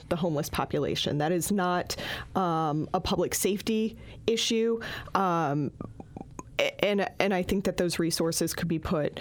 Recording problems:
squashed, flat; heavily

